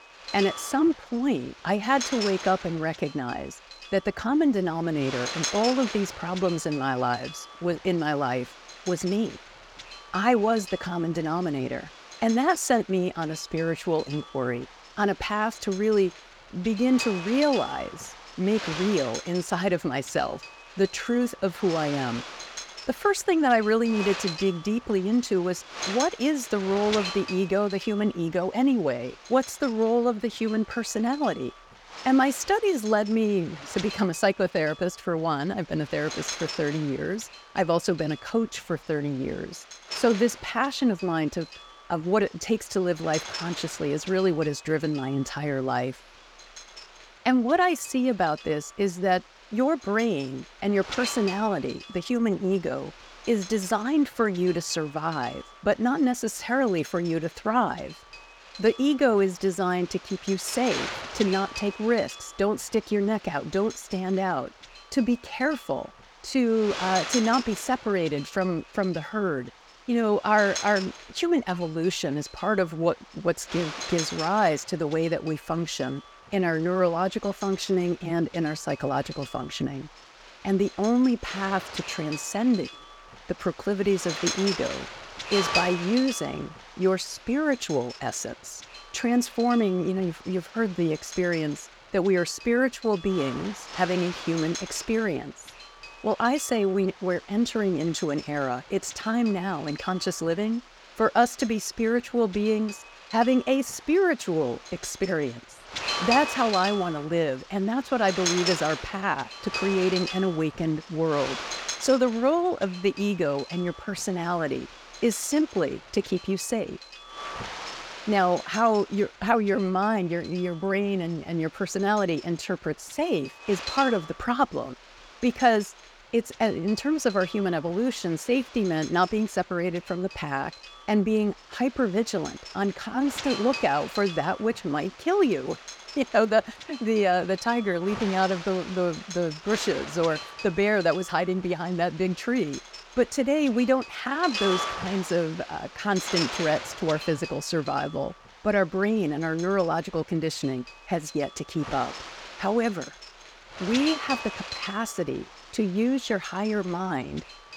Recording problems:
wind noise on the microphone; heavy; 9 dB below the speech

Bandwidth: 18.5 kHz